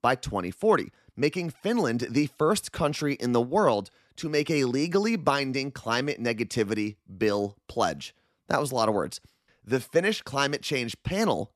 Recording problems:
none

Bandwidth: 13.5 kHz